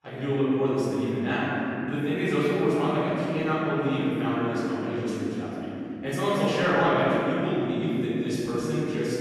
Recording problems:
room echo; strong; dies away in 3 s
off-mic speech; far

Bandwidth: 14.5 kHz